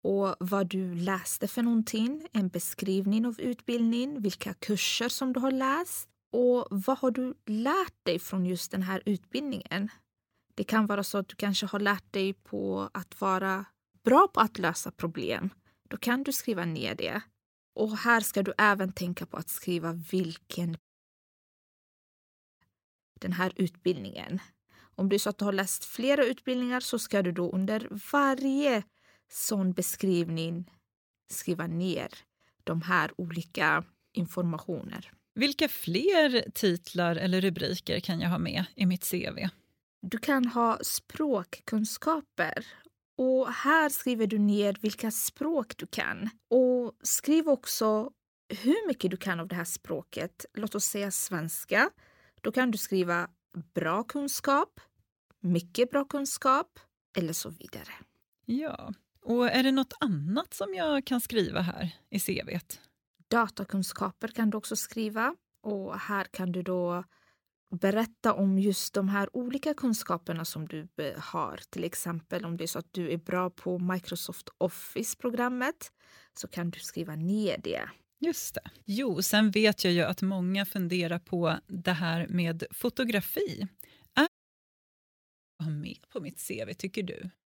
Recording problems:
audio cutting out; at 21 s for 2 s and at 1:24 for 1.5 s

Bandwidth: 18 kHz